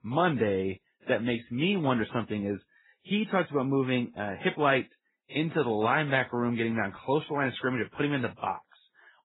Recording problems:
garbled, watery; badly; nothing above 4 kHz

